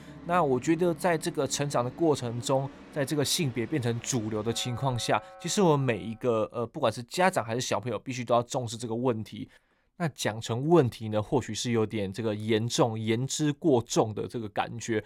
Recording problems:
background music; noticeable; until 5.5 s; 20 dB below the speech

